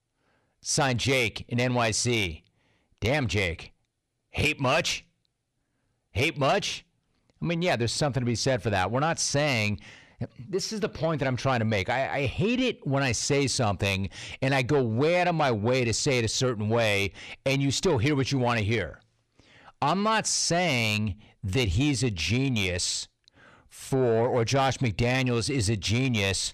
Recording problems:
distortion; slight; 10 dB below the speech

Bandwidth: 14.5 kHz